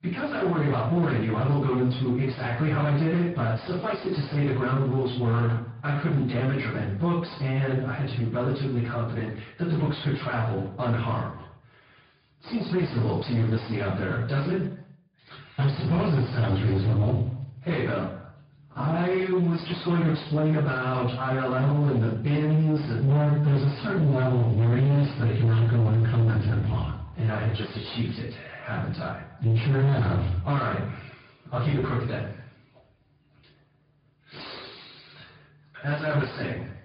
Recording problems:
distortion; heavy; 7 dB below the speech
off-mic speech; far
high frequencies cut off; severe; nothing above 5 kHz
room echo; noticeable; dies away in 0.4 s
echo of what is said; faint; throughout; 110 ms later, 25 dB below the speech
garbled, watery; slightly

